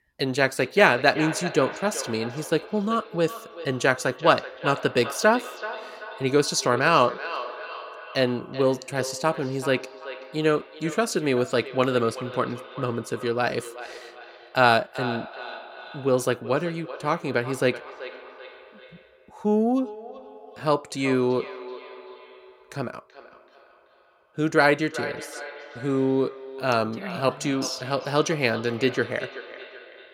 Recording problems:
echo of what is said; noticeable; throughout; 380 ms later, 15 dB below the speech

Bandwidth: 16.5 kHz